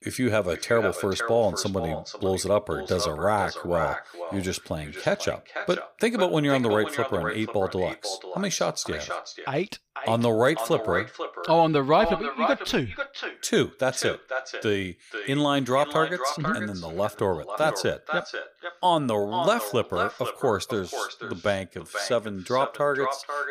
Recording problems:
echo of what is said; strong; throughout; 490 ms later, 7 dB below the speech

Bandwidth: 15 kHz